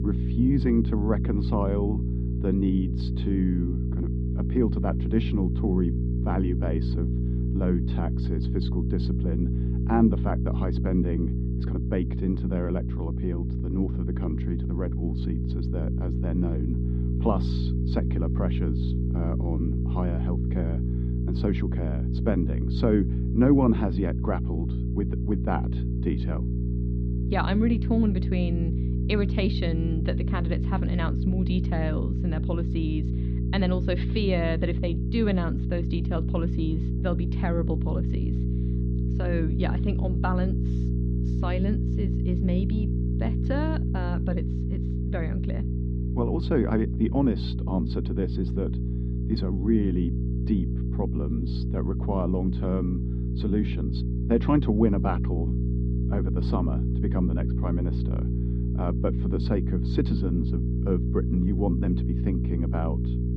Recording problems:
muffled; slightly; fading above 4 kHz
electrical hum; loud; throughout; 60 Hz, 6 dB below the speech

